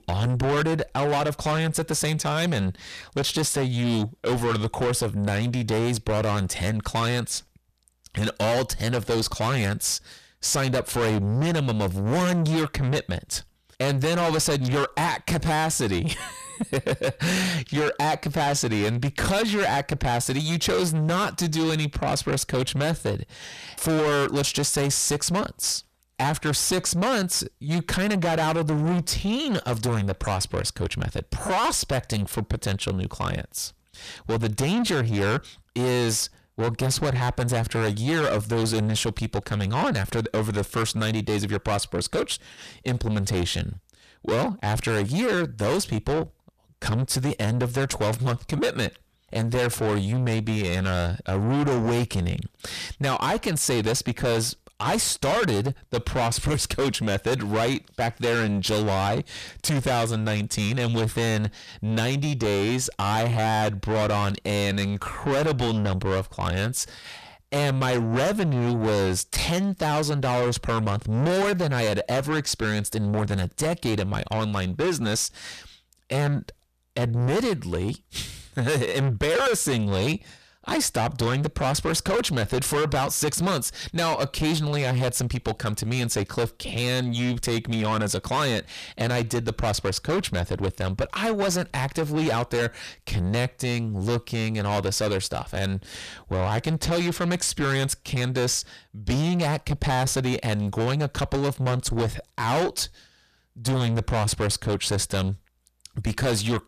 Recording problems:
distortion; heavy; 6 dB below the speech

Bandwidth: 14.5 kHz